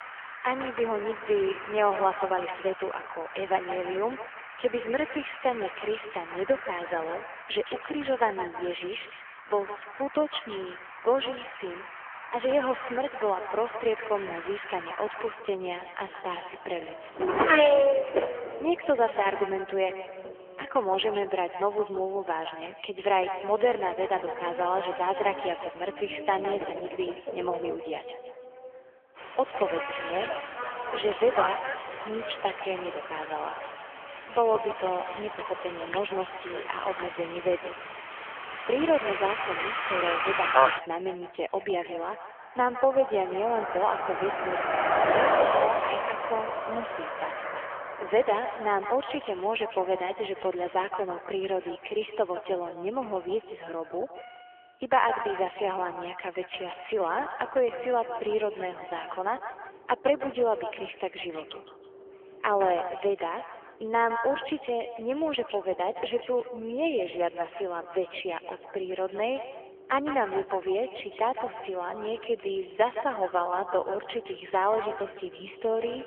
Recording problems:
phone-call audio; poor line; nothing above 3.5 kHz
echo of what is said; strong; throughout; 160 ms later, 10 dB below the speech
traffic noise; loud; throughout; 2 dB below the speech

